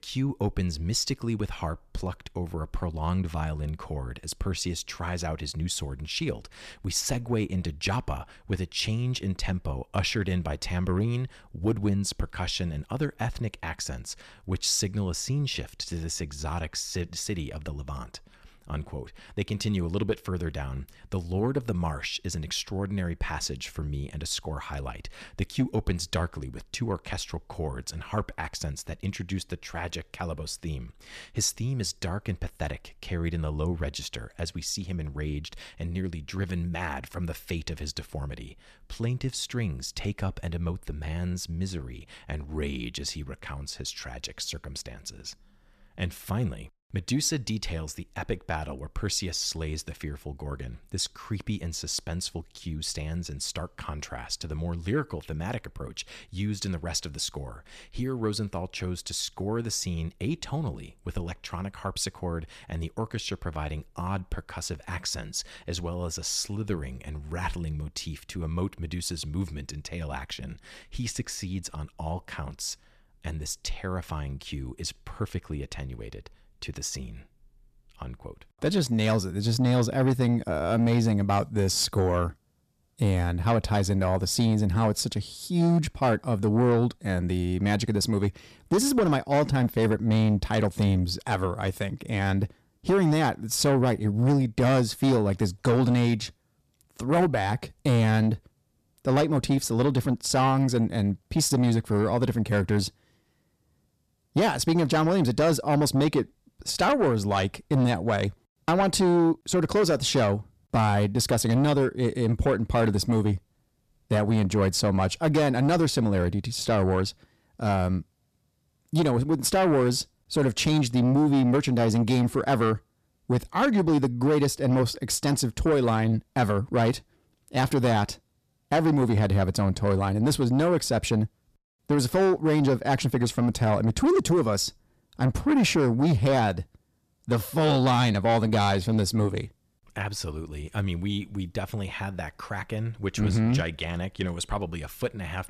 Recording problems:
distortion; slight; 10 dB below the speech

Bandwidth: 14.5 kHz